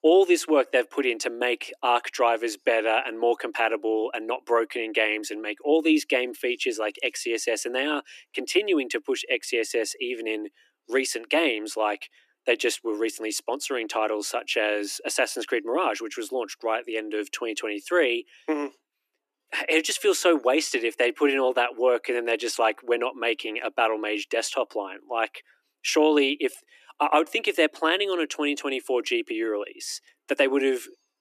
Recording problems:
thin; somewhat; fading below 300 Hz

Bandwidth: 14.5 kHz